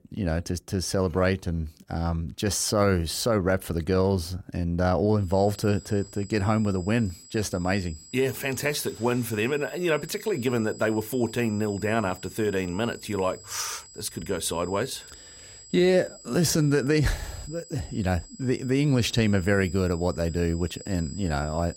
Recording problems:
high-pitched whine; noticeable; from 5.5 s on; 7.5 kHz, 20 dB below the speech

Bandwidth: 16 kHz